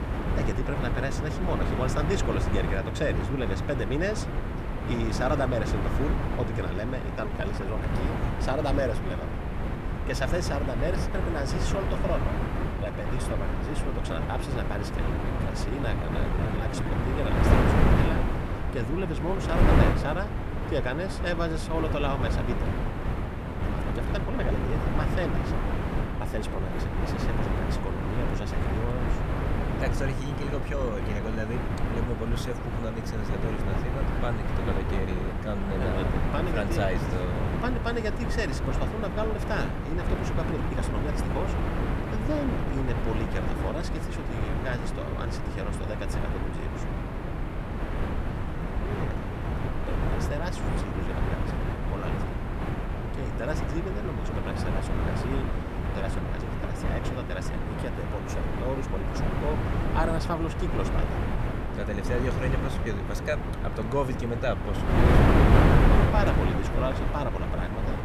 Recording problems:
wind noise on the microphone; heavy; 1 dB above the speech
uneven, jittery; strongly; from 7 to 42 s

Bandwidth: 14.5 kHz